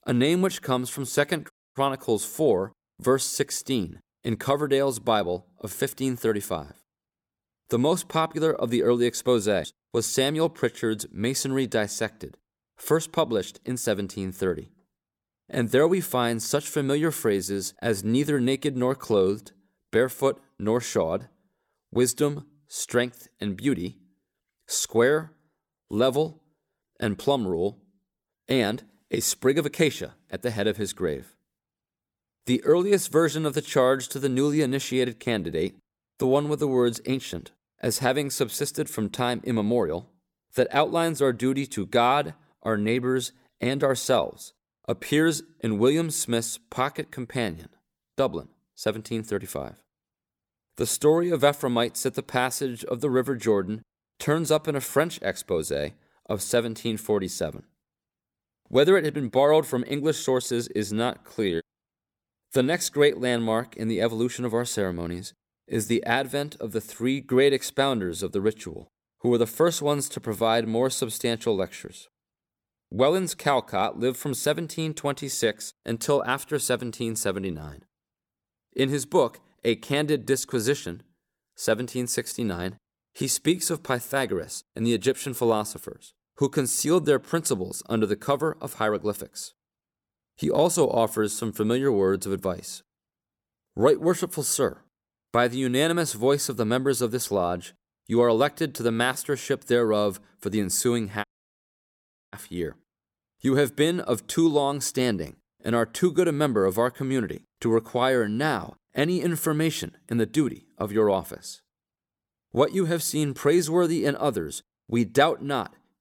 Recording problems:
audio cutting out; at 1.5 s and at 1:41 for 1 s

